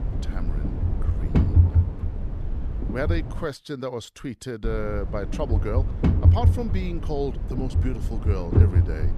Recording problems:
low rumble; loud; until 3.5 s and from 4.5 s on; 4 dB below the speech

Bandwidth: 14 kHz